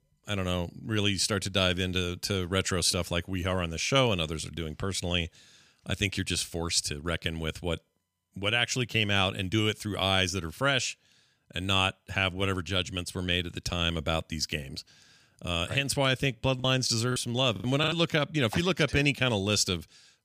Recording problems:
choppy; very; from 17 to 18 s; 7% of the speech affected

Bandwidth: 15 kHz